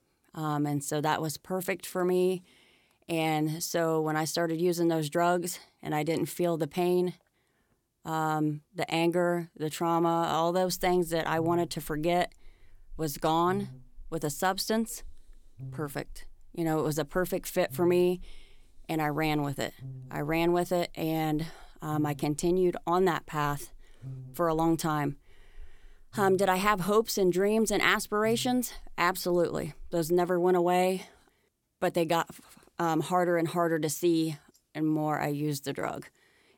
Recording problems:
electrical hum; faint; from 11 to 30 s; 50 Hz, 30 dB below the speech

